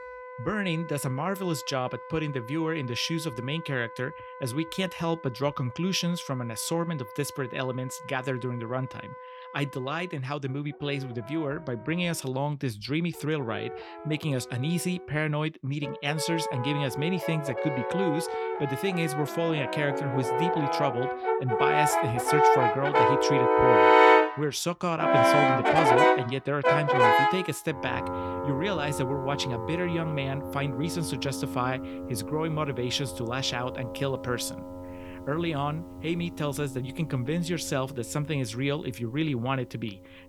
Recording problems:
background music; very loud; throughout; 4 dB above the speech

